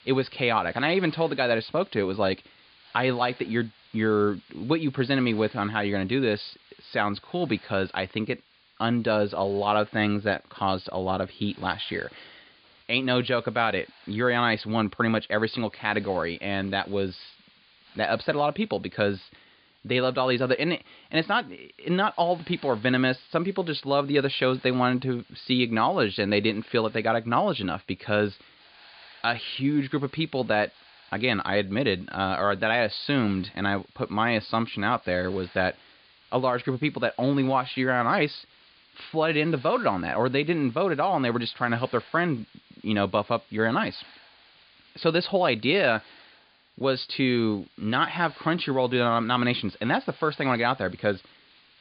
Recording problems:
high frequencies cut off; severe; nothing above 5 kHz
hiss; faint; throughout; 25 dB below the speech

